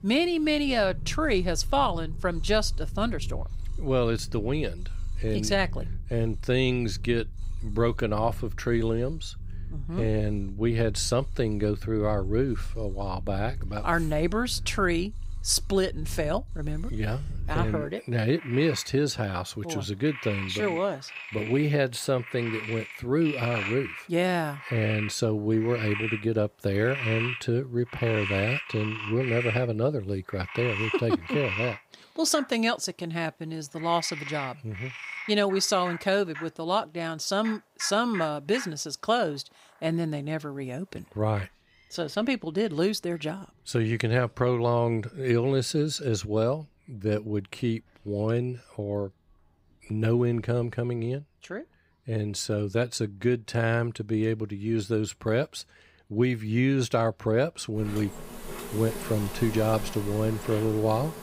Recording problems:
animal sounds; loud; throughout; 9 dB below the speech

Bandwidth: 15.5 kHz